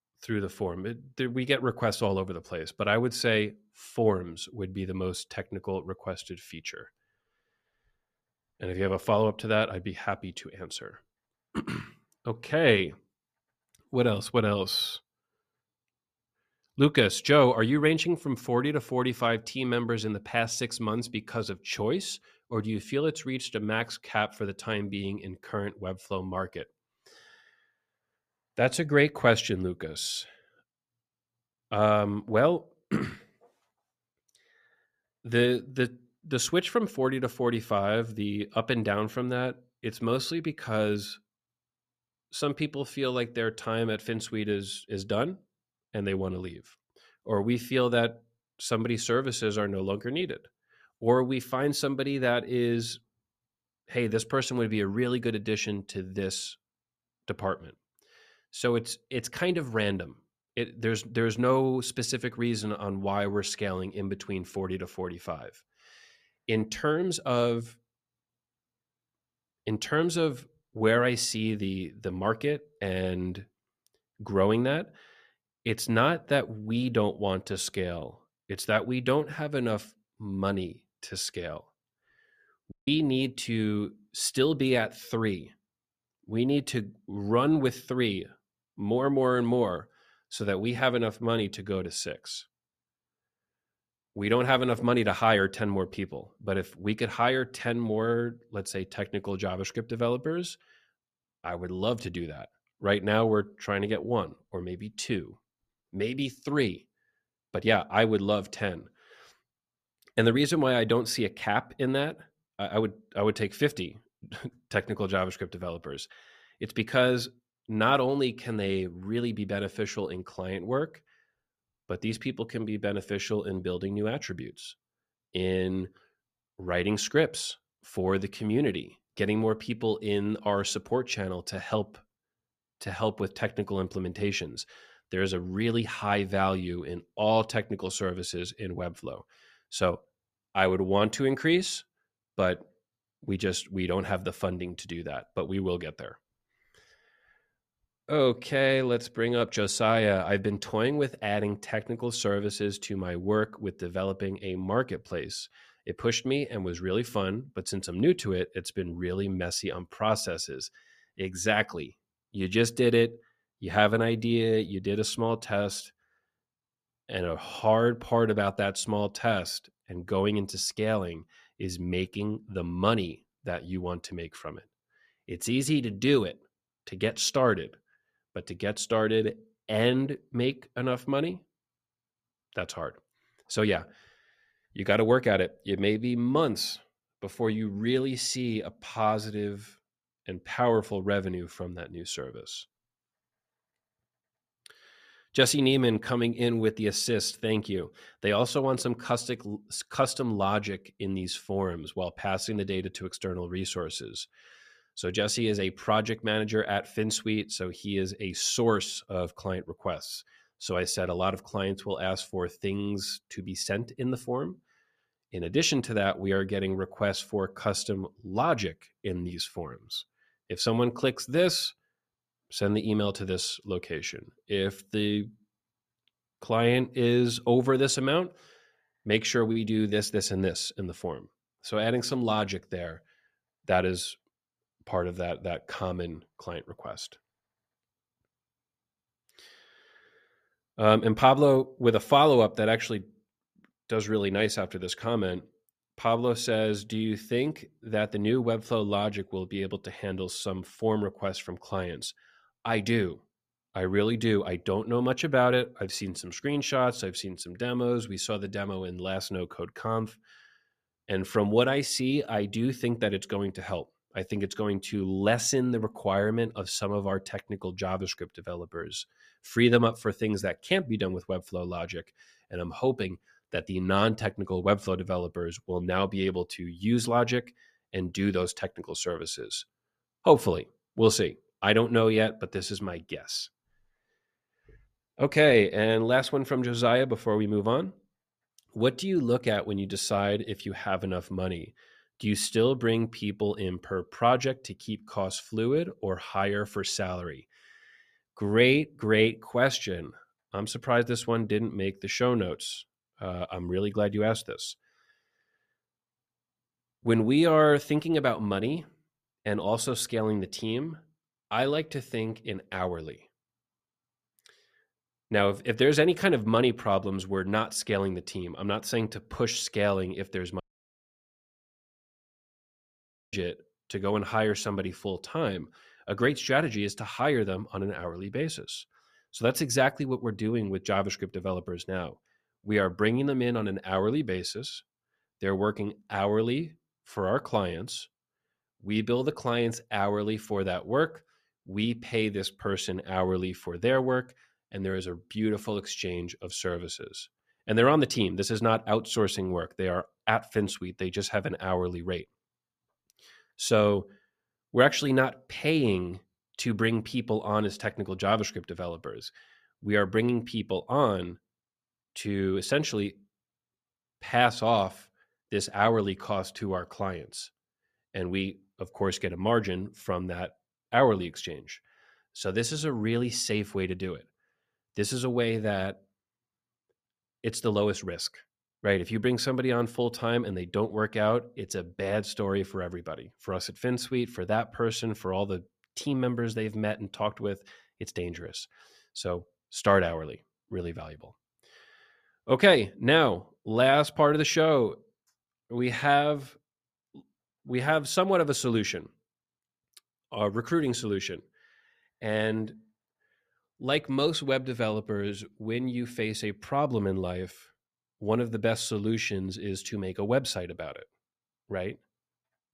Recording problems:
audio cutting out; at 1:23 and at 5:21 for 2.5 s

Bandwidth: 14.5 kHz